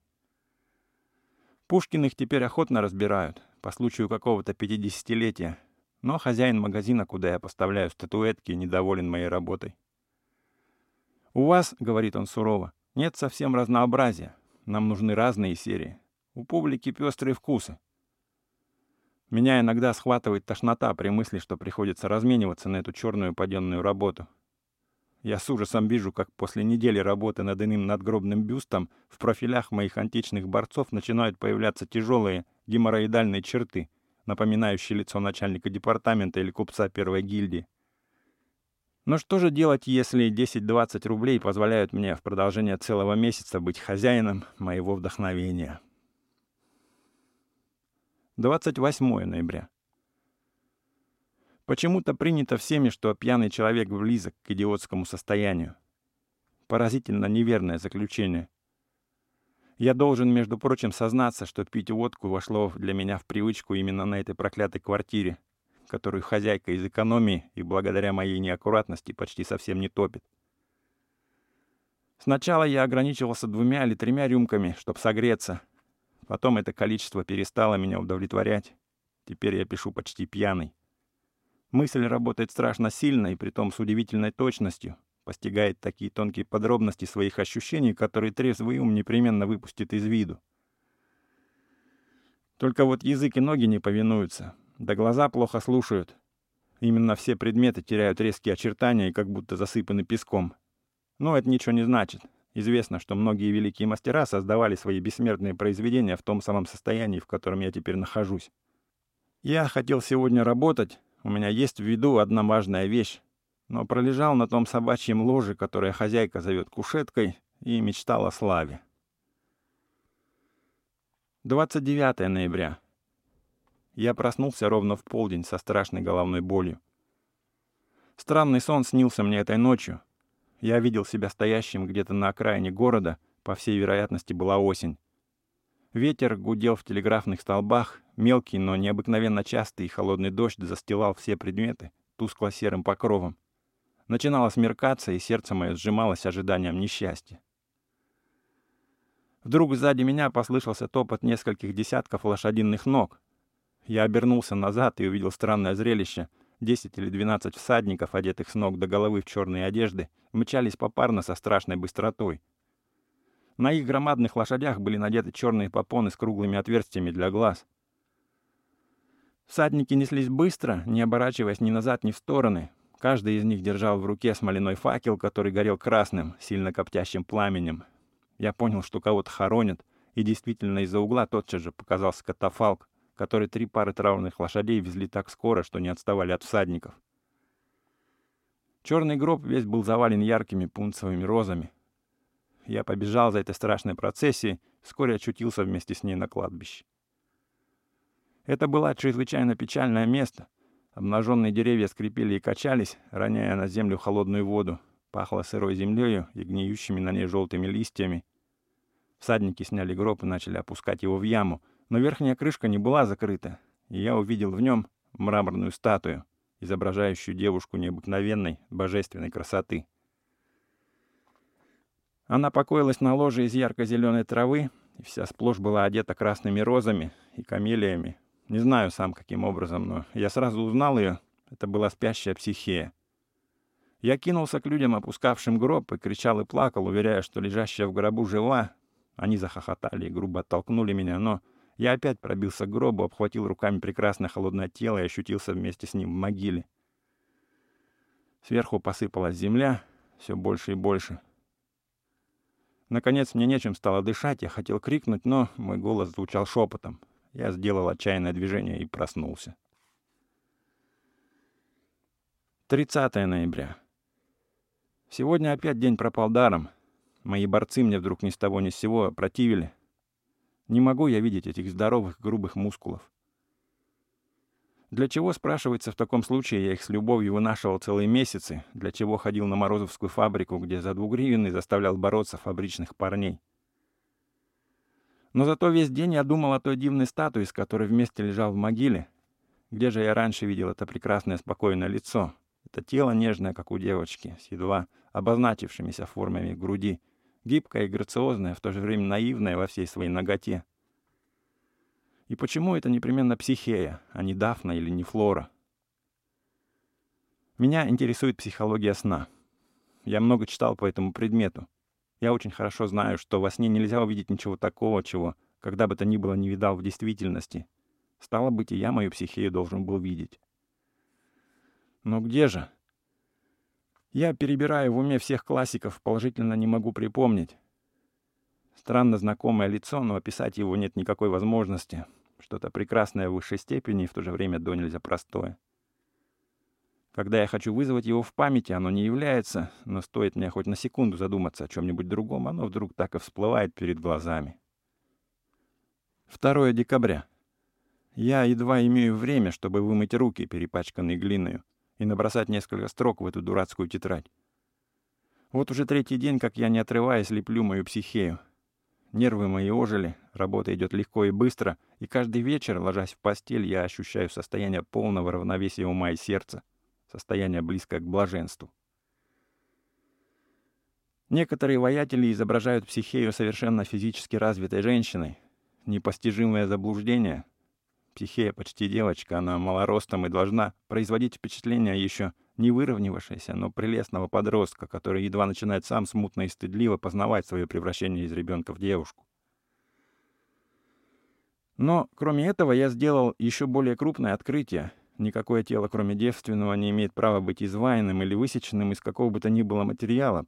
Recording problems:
none

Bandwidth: 16 kHz